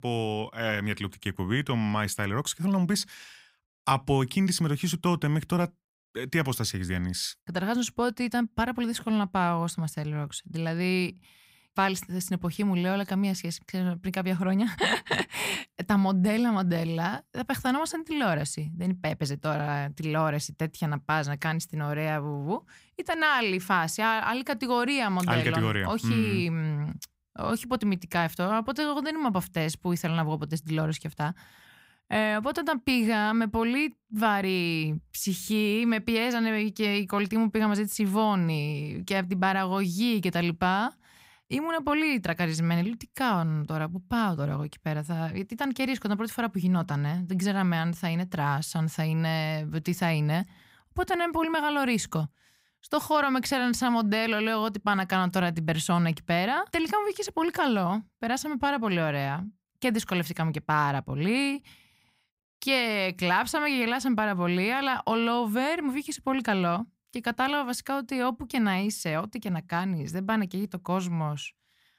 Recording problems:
none

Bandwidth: 15.5 kHz